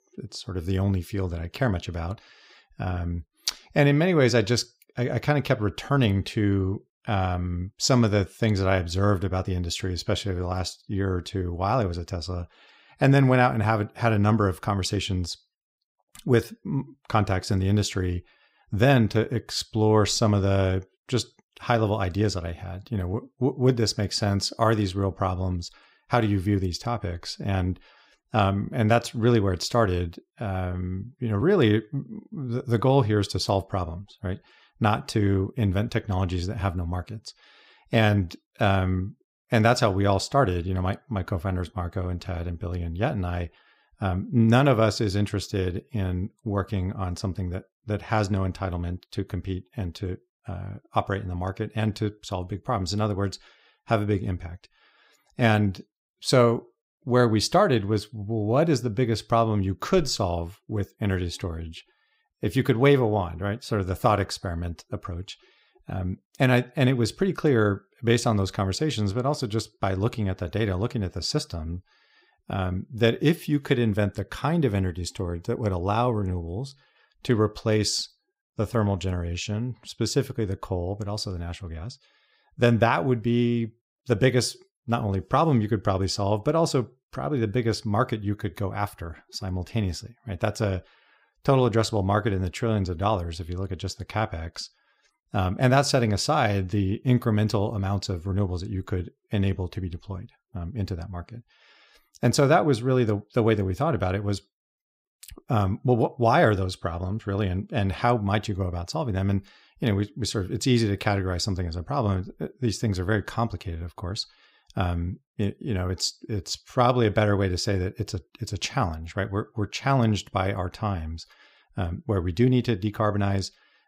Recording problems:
none

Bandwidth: 15.5 kHz